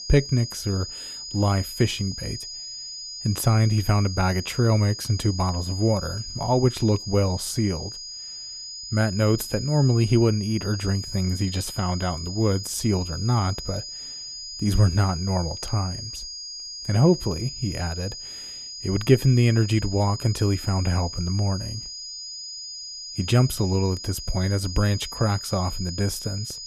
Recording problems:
high-pitched whine; loud; throughout; 5 kHz, 9 dB below the speech

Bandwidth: 14.5 kHz